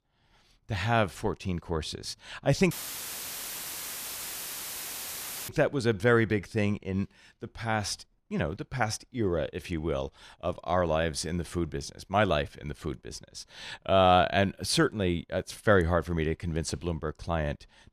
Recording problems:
audio cutting out; filled with static; at 2.5 s for 3 s

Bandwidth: 14.5 kHz